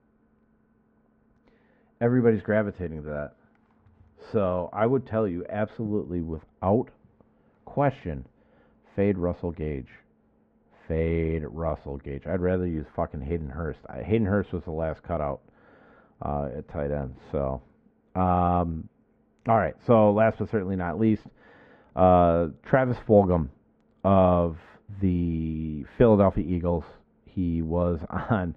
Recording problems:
muffled; very; fading above 1 kHz

